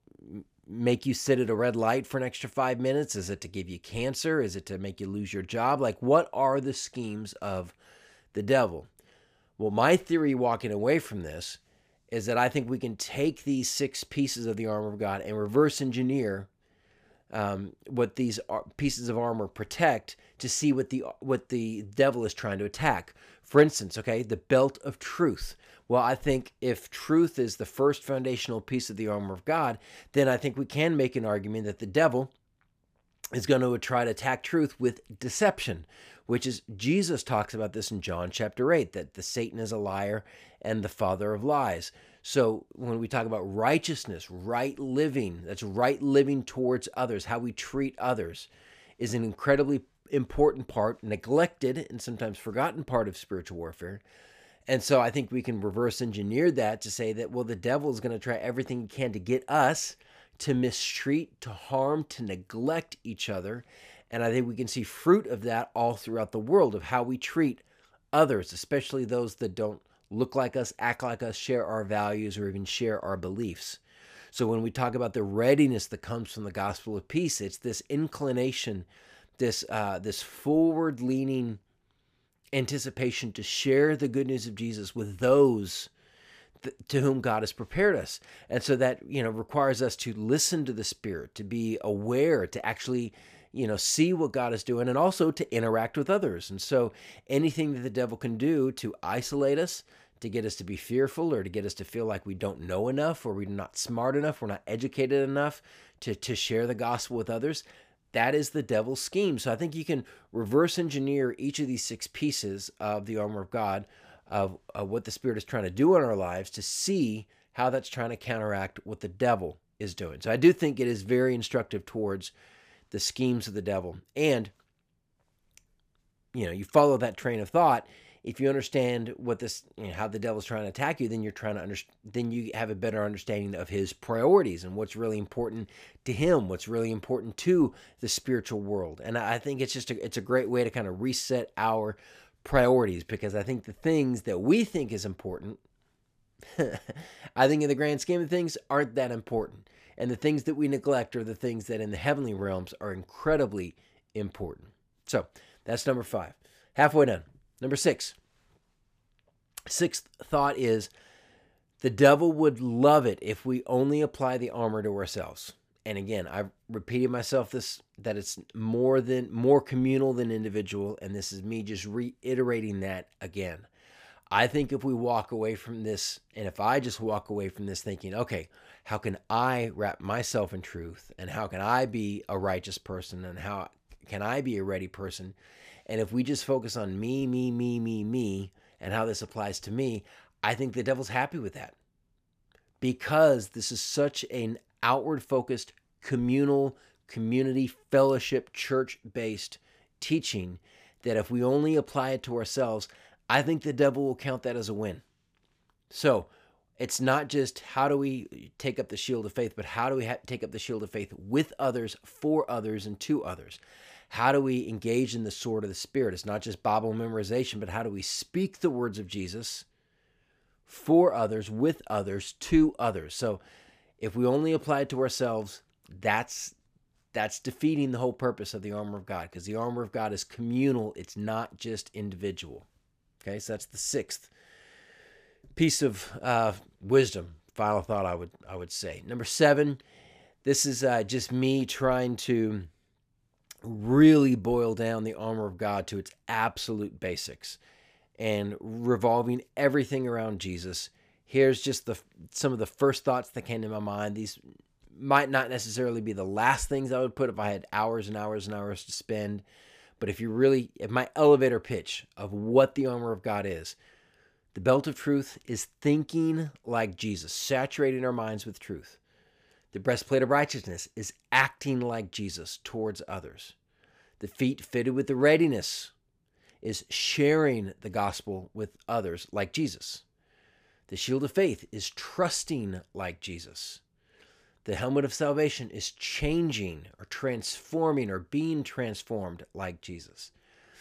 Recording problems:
none

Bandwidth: 15 kHz